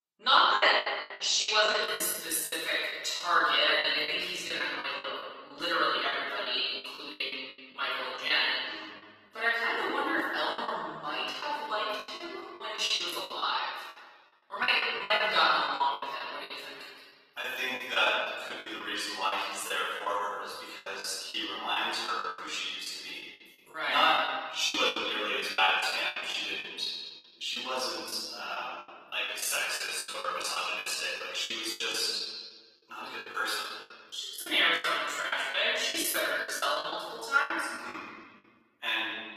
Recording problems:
room echo; strong; dies away in 1.4 s
off-mic speech; far
thin; very; fading below 950 Hz
garbled, watery; slightly; nothing above 14.5 kHz
choppy; very; 14% of the speech affected

